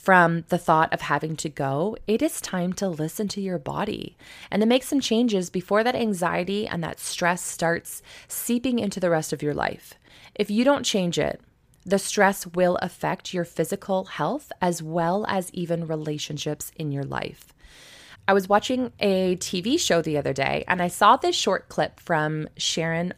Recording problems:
none

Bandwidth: 15 kHz